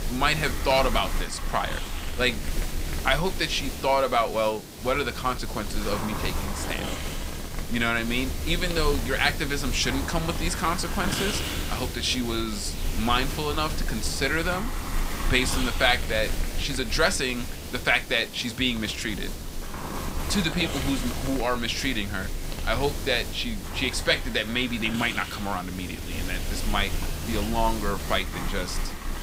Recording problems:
hiss; loud; throughout; 6 dB below the speech

